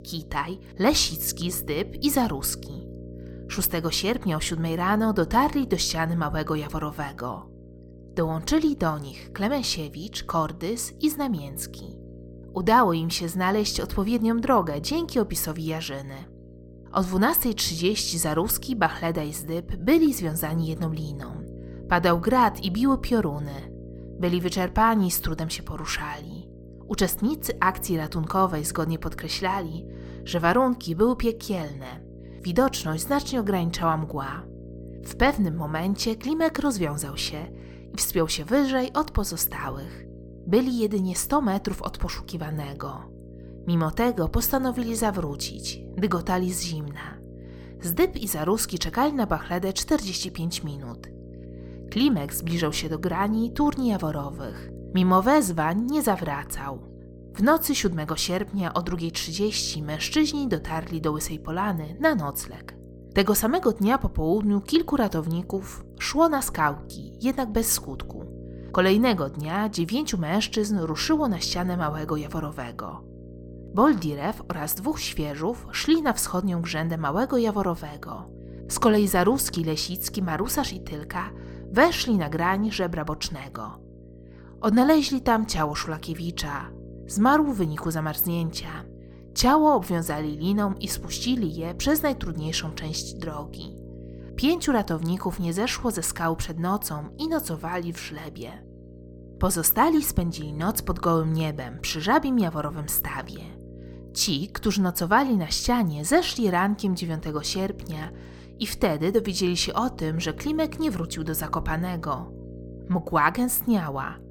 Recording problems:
electrical hum; faint; throughout; 60 Hz, 20 dB below the speech

